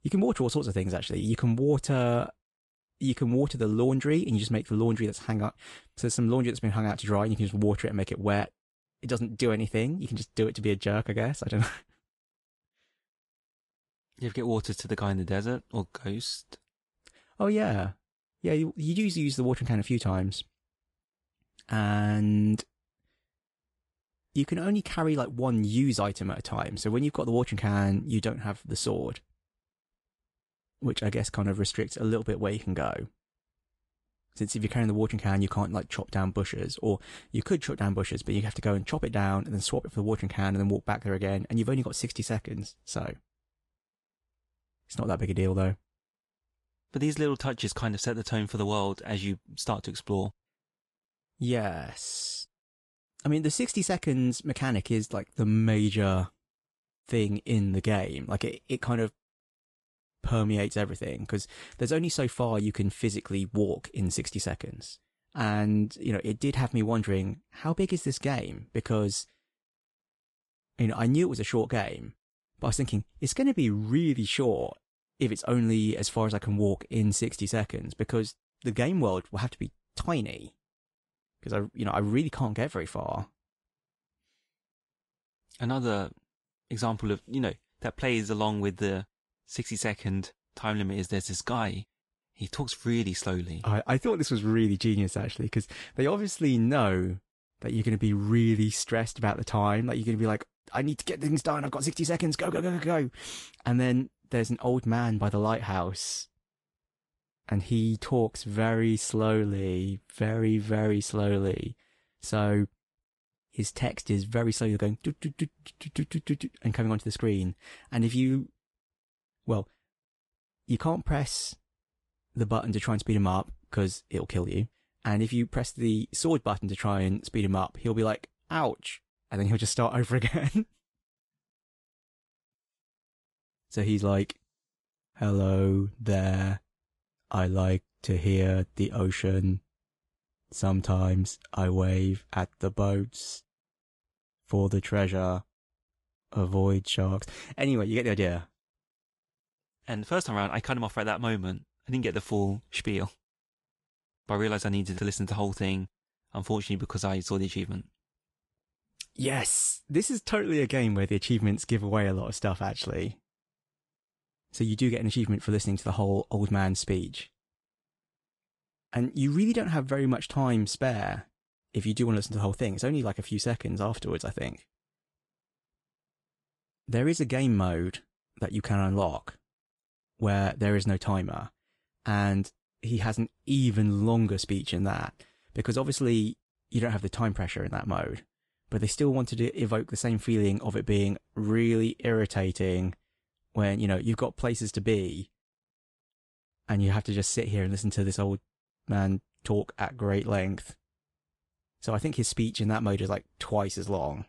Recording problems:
garbled, watery; slightly; nothing above 10 kHz

